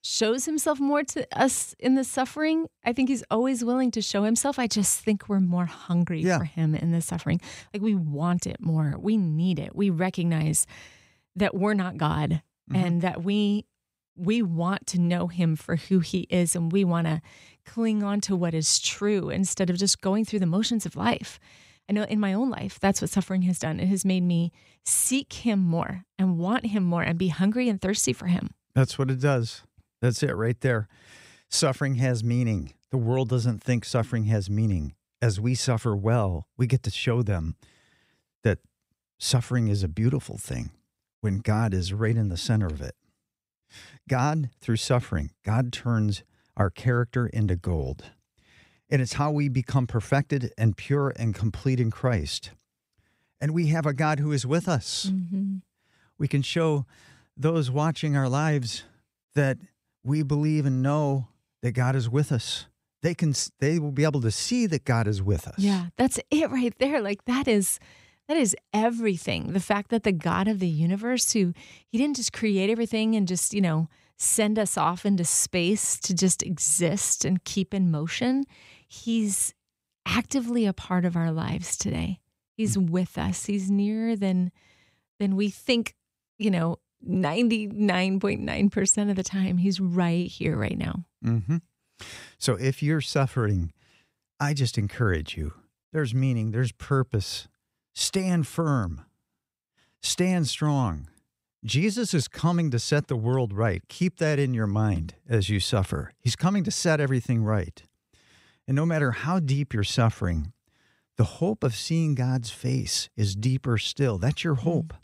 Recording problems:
none

